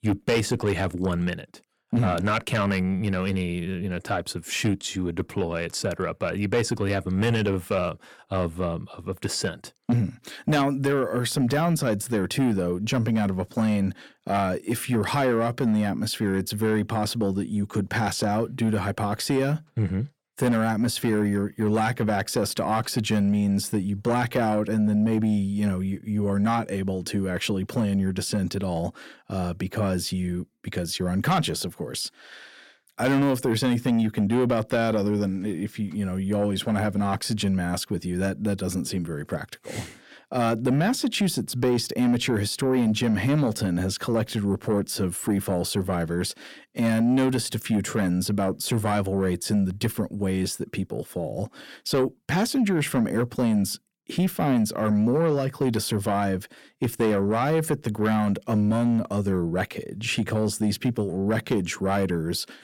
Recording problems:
distortion; slight; 10 dB below the speech

